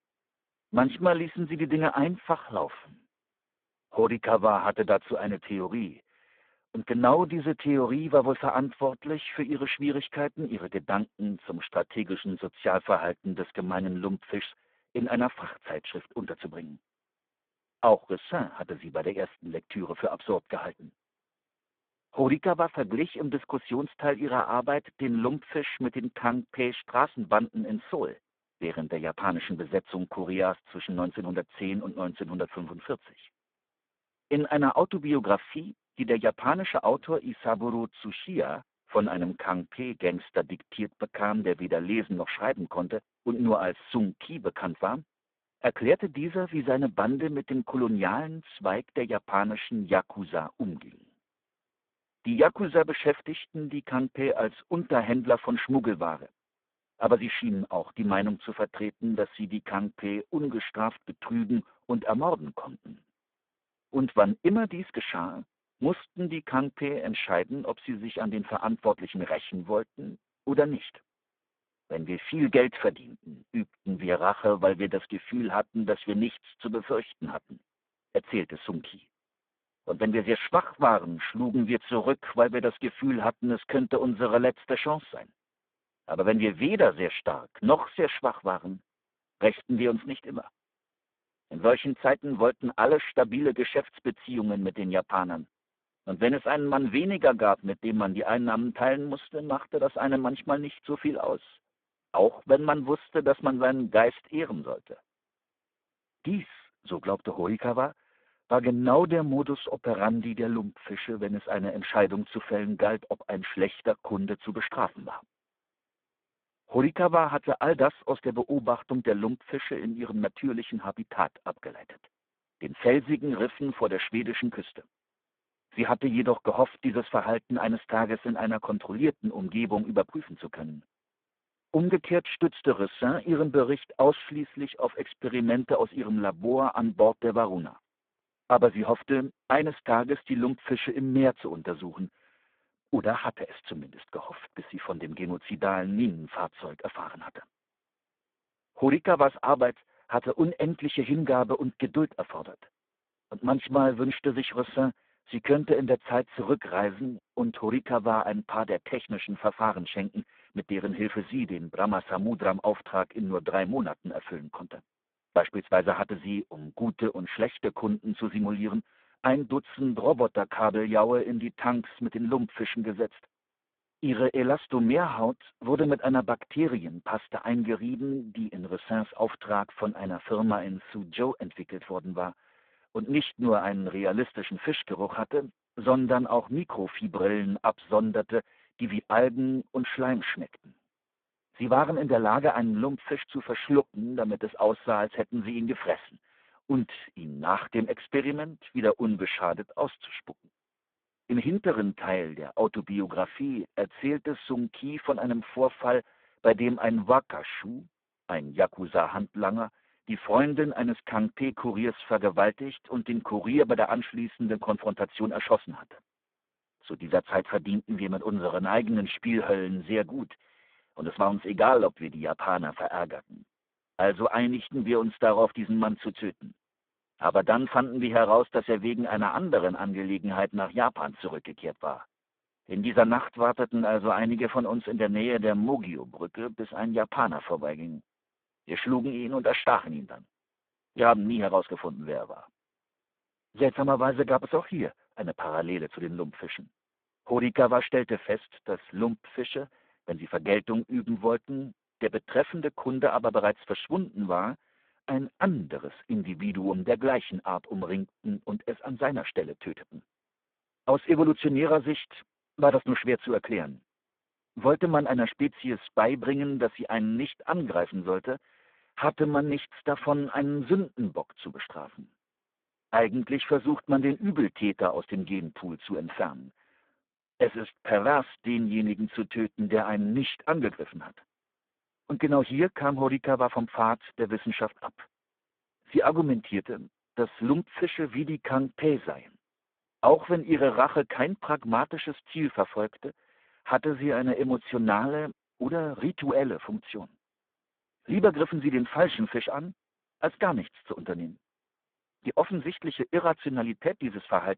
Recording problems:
phone-call audio; poor line

